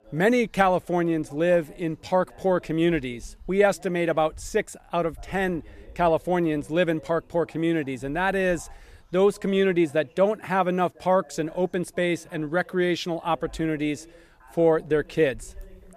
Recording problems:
voice in the background; faint; throughout; 30 dB below the speech

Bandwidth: 14.5 kHz